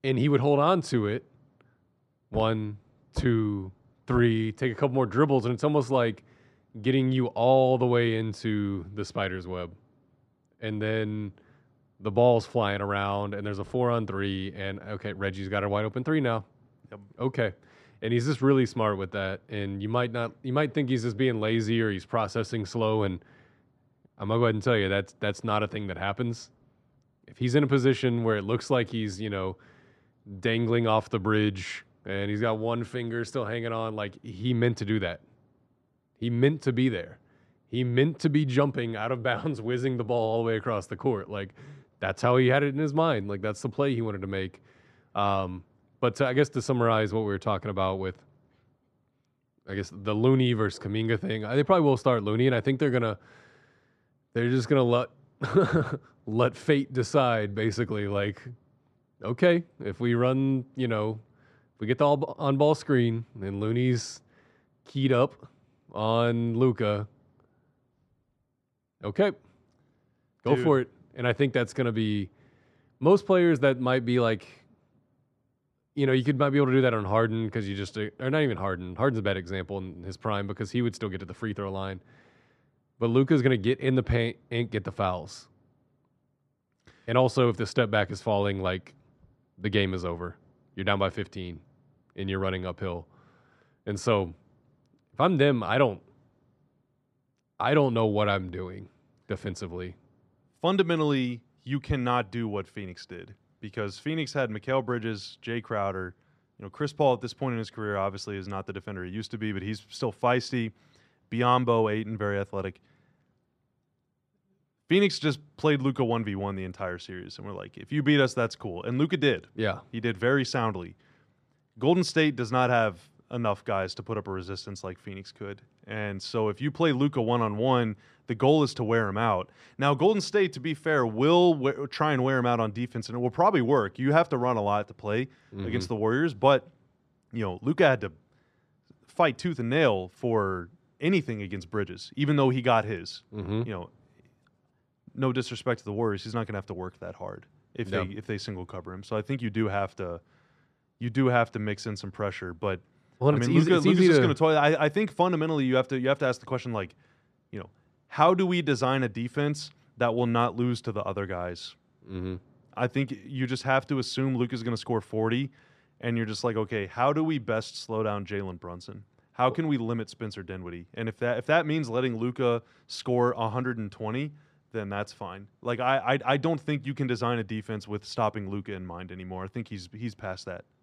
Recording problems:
none

